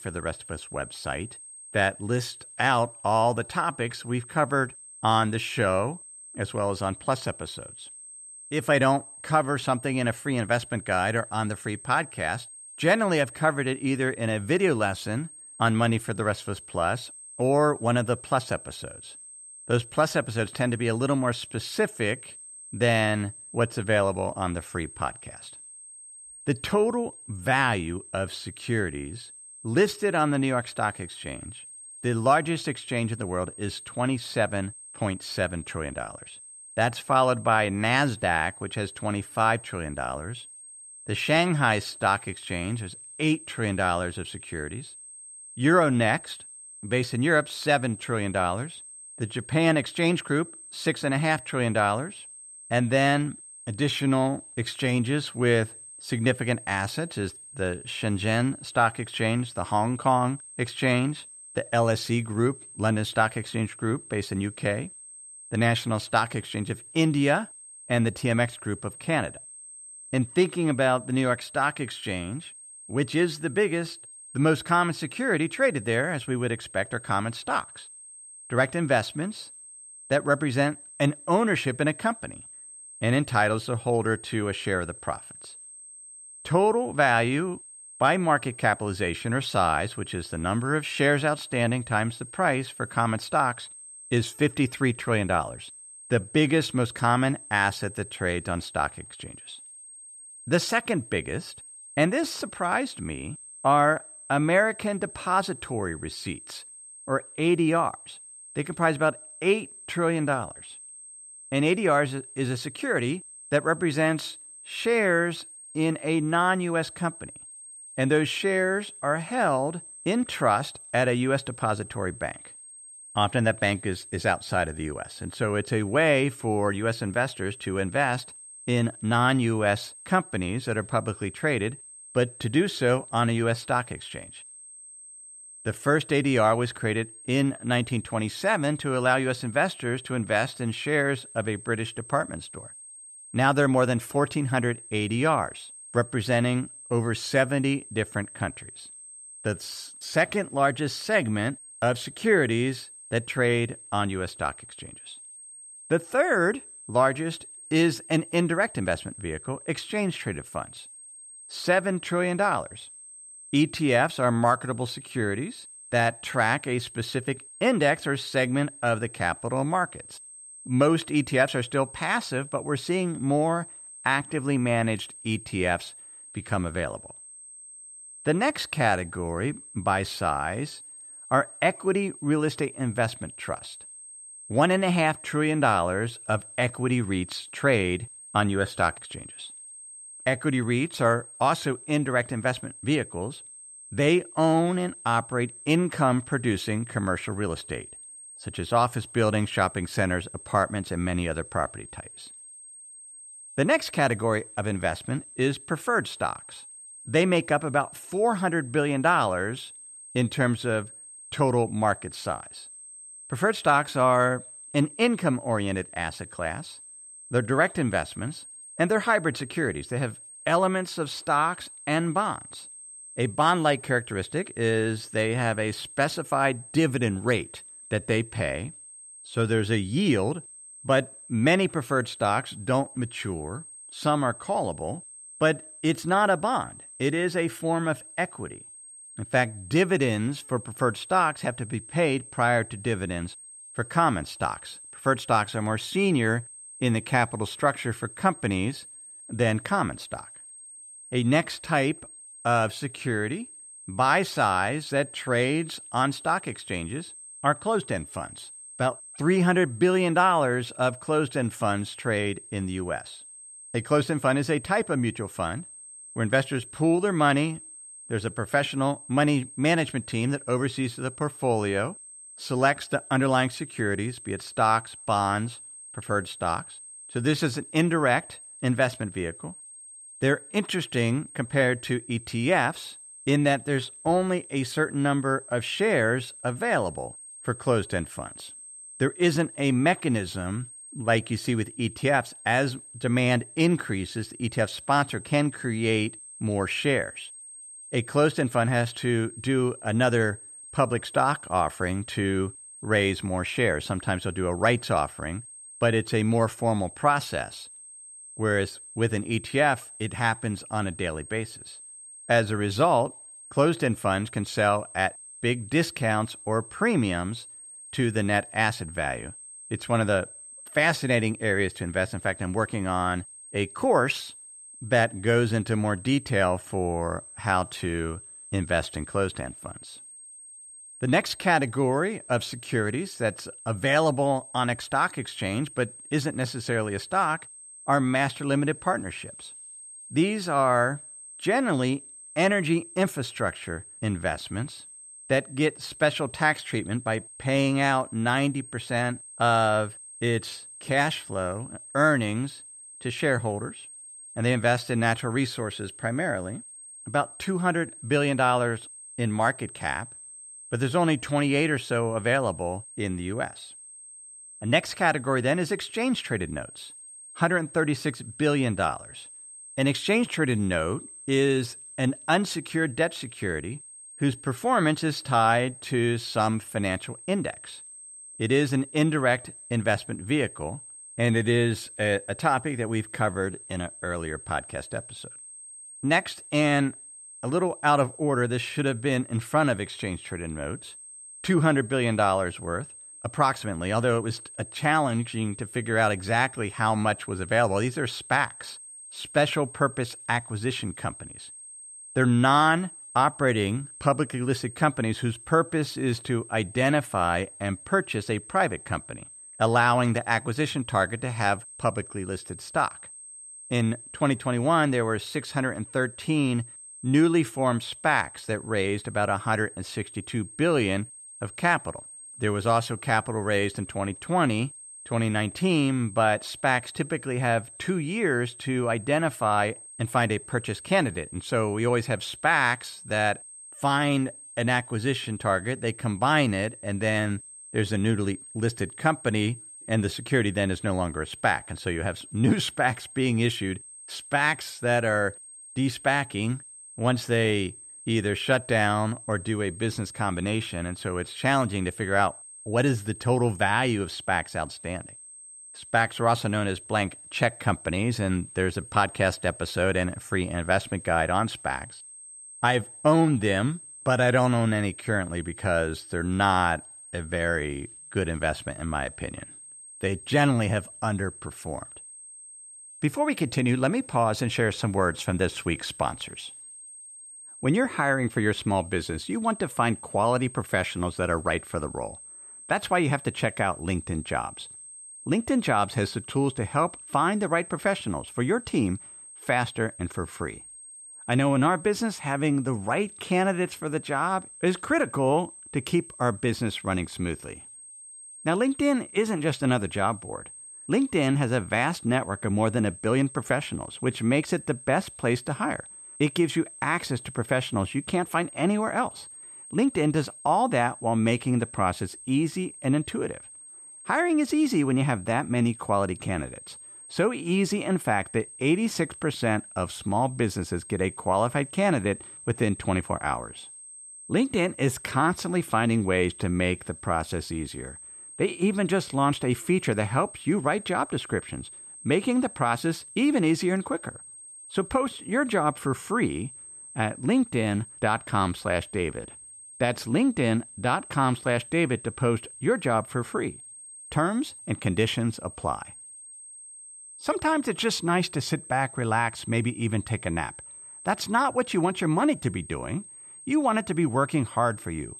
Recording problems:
high-pitched whine; noticeable; throughout; 8.5 kHz, 15 dB below the speech

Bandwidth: 13.5 kHz